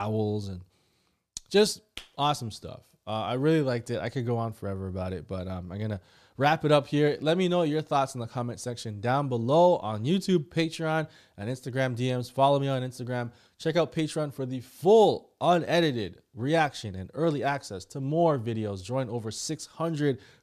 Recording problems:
abrupt cut into speech; at the start

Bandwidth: 14.5 kHz